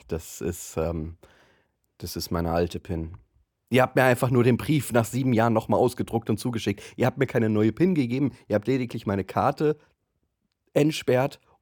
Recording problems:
none

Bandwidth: 18.5 kHz